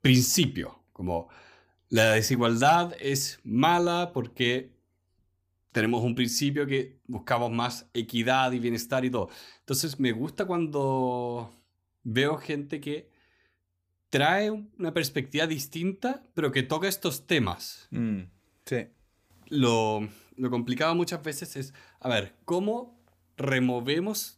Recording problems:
none

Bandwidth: 15 kHz